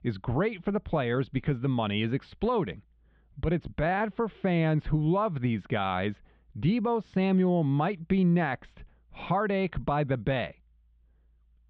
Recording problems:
muffled; very; fading above 3.5 kHz

